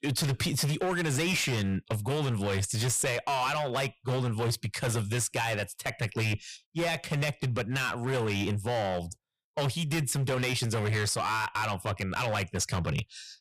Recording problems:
distortion; heavy; 20% of the sound clipped

